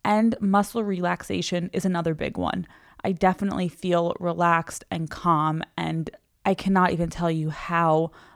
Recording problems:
none

